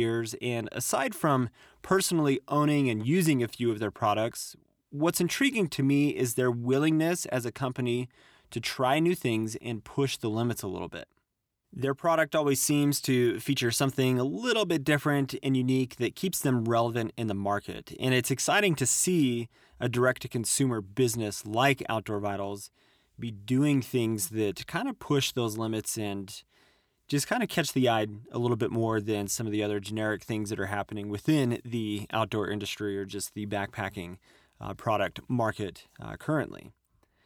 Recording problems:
abrupt cut into speech; at the start

